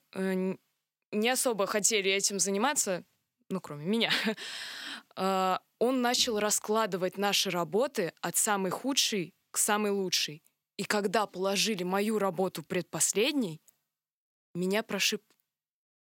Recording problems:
none

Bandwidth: 16.5 kHz